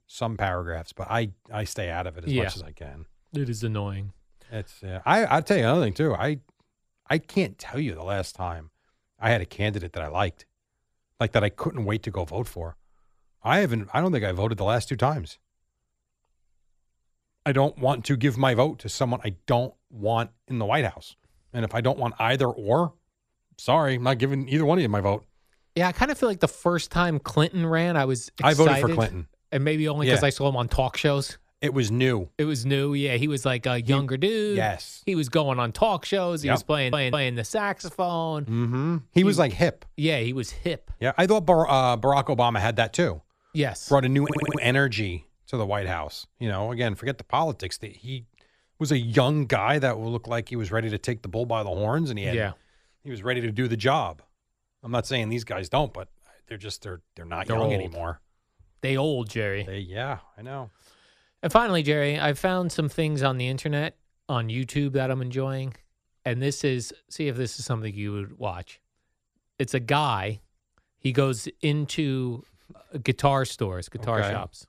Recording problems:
audio stuttering; at 37 s and at 44 s

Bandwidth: 14.5 kHz